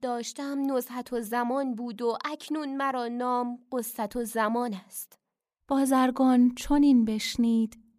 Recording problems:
none

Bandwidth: 15 kHz